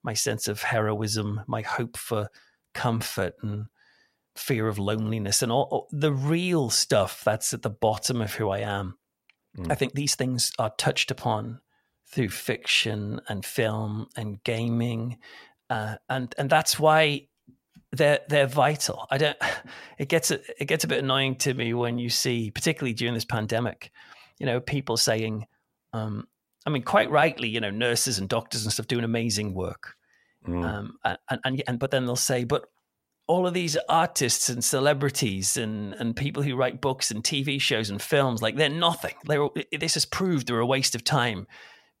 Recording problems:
uneven, jittery; strongly; from 2.5 to 40 s

